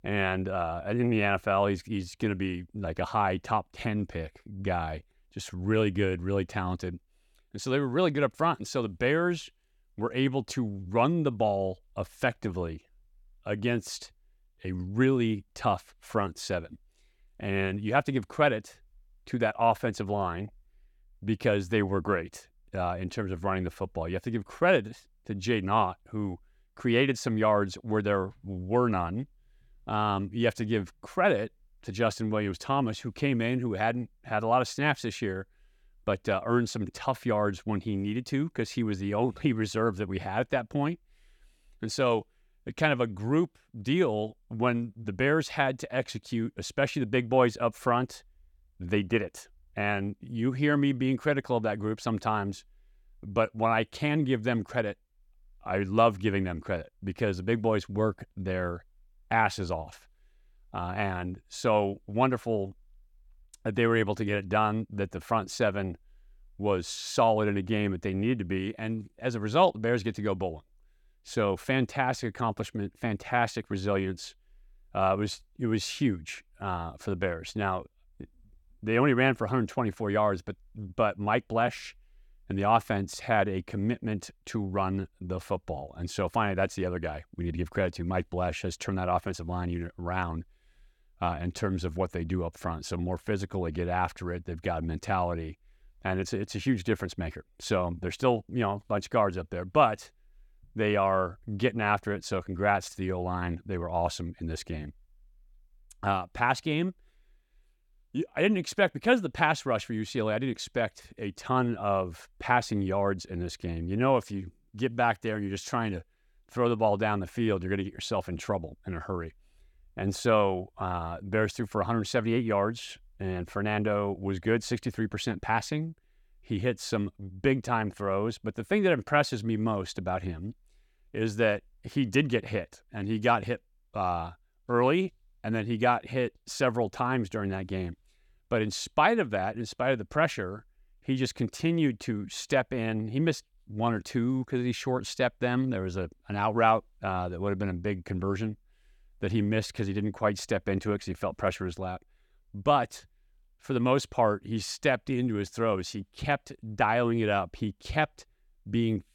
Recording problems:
none

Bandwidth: 17.5 kHz